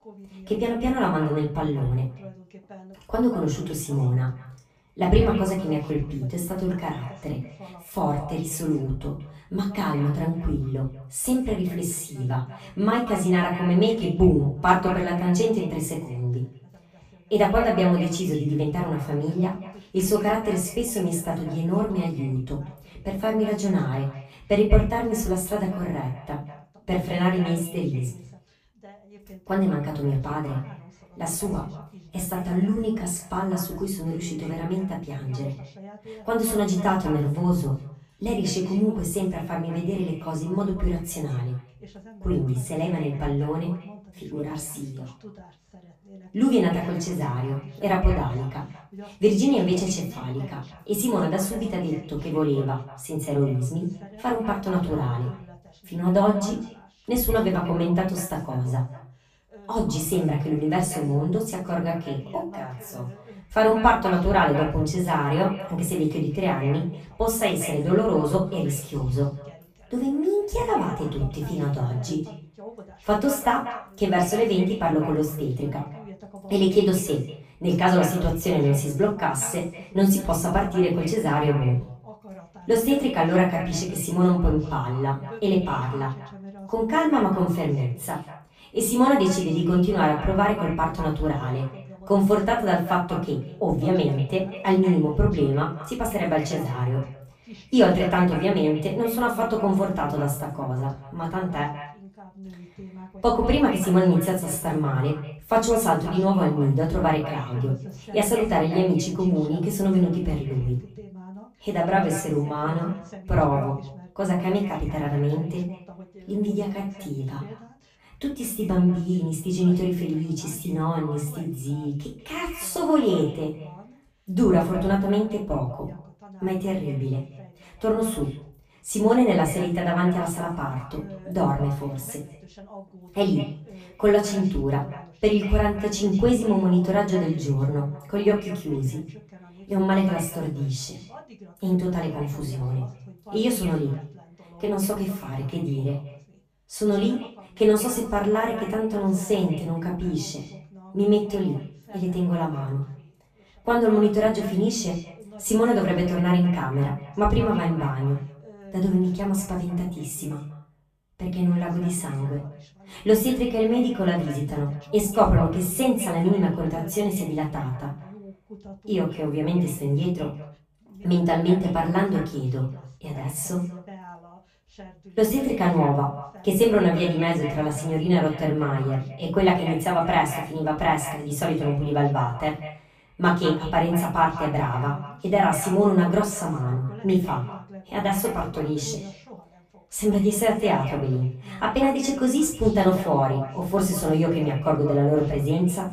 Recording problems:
off-mic speech; far
echo of what is said; noticeable; throughout; 190 ms later, 15 dB below the speech
room echo; slight; dies away in 0.3 s
voice in the background; faint; throughout; 20 dB below the speech

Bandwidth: 15 kHz